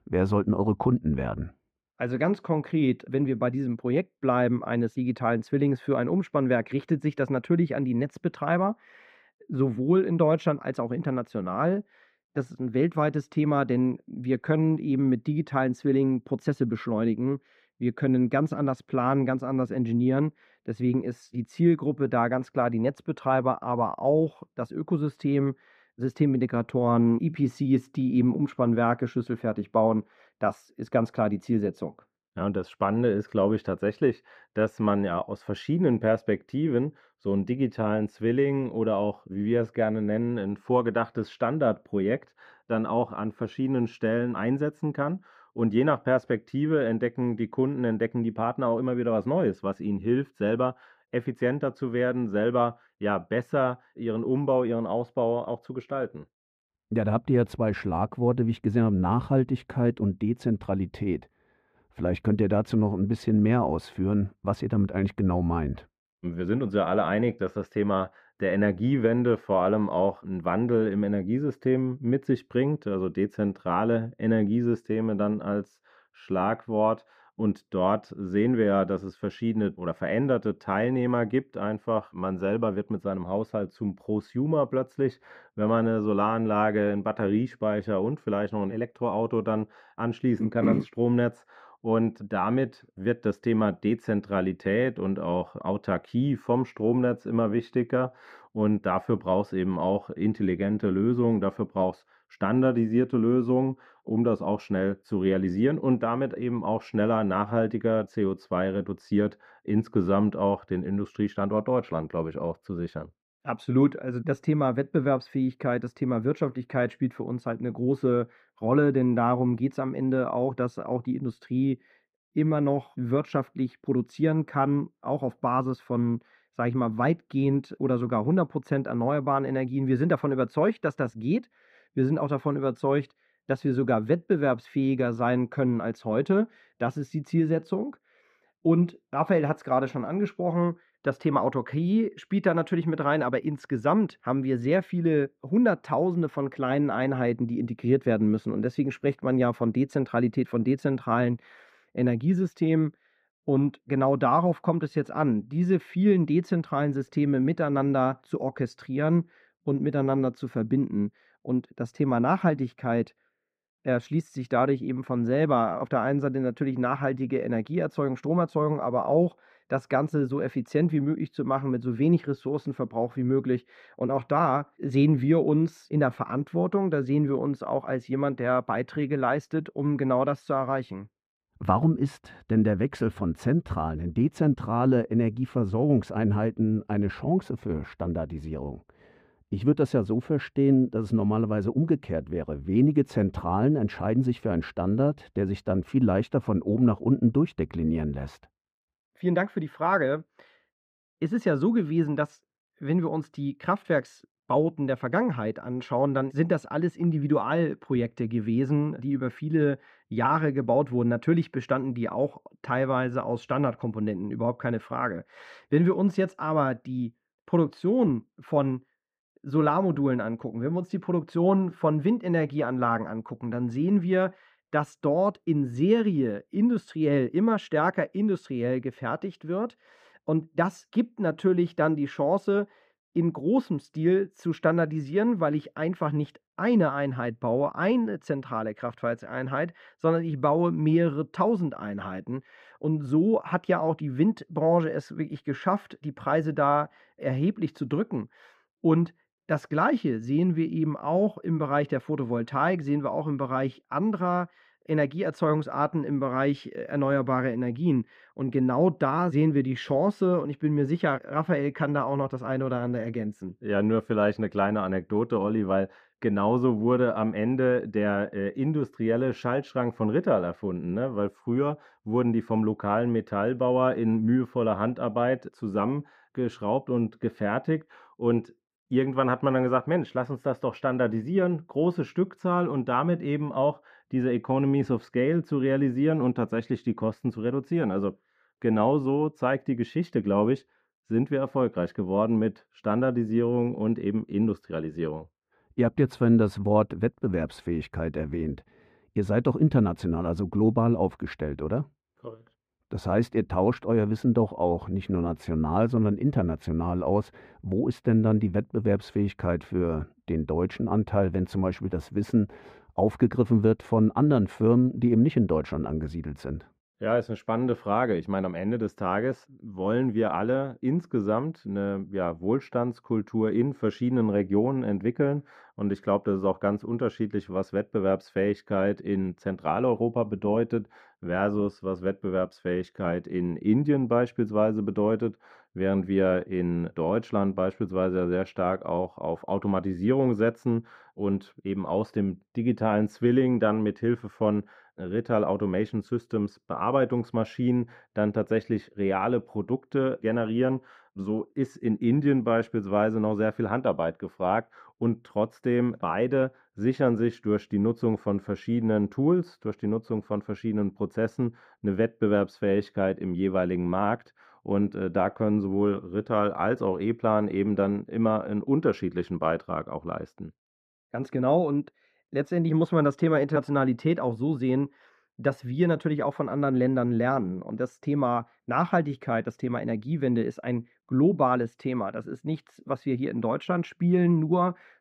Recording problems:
muffled; very; fading above 3.5 kHz

